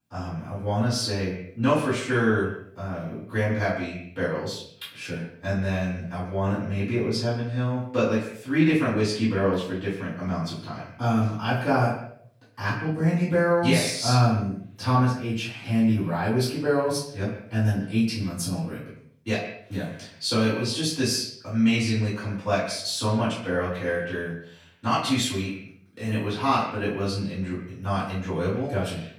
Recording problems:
off-mic speech; far
echo of what is said; noticeable; throughout; 120 ms later, 15 dB below the speech
room echo; noticeable; dies away in 0.4 s

